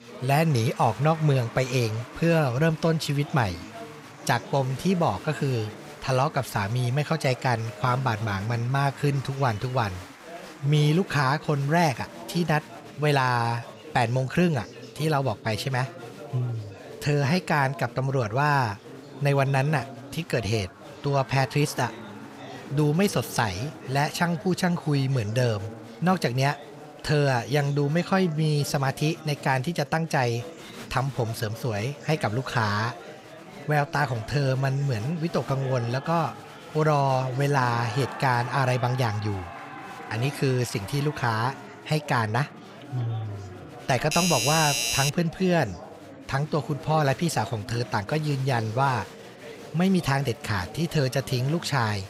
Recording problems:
chatter from many people; noticeable; throughout; 15 dB below the speech
doorbell; loud; from 44 to 45 s; peak 2 dB above the speech

